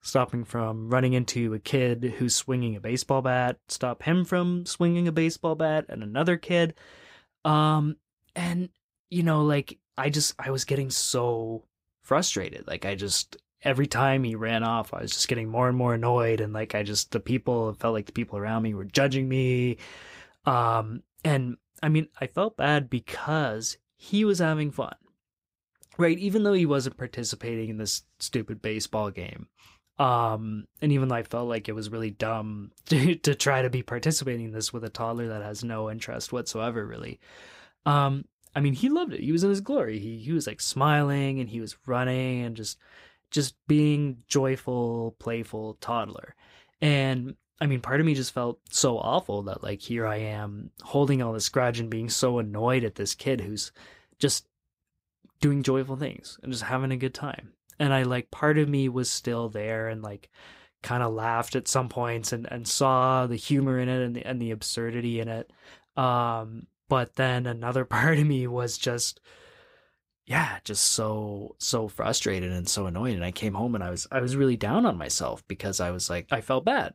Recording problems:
none

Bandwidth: 15.5 kHz